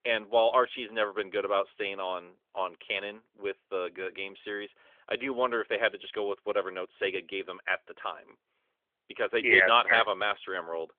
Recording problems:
phone-call audio; nothing above 3.5 kHz

